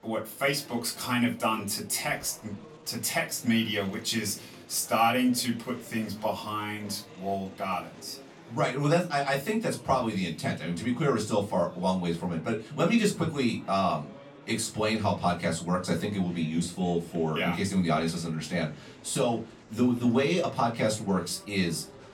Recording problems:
off-mic speech; far
room echo; very slight; dies away in 0.2 s
murmuring crowd; faint; throughout; 20 dB below the speech

